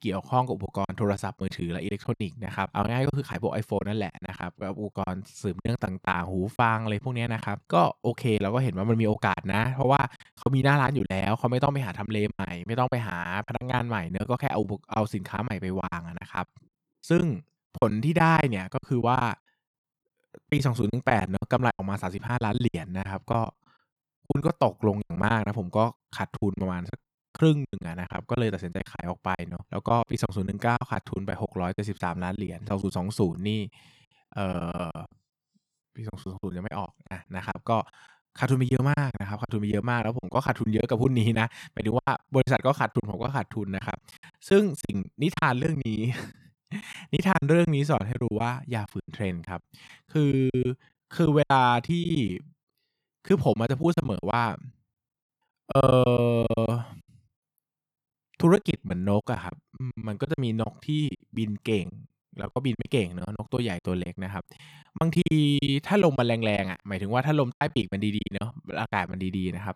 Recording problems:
choppy; very; 12% of the speech affected

